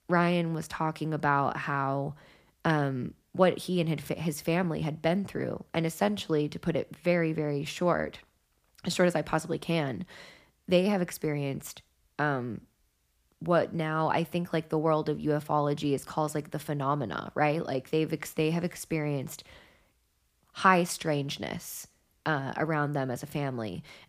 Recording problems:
none

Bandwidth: 15 kHz